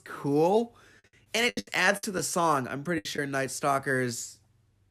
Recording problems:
choppy; very; at 1.5 s and at 3 s; 17% of the speech affected

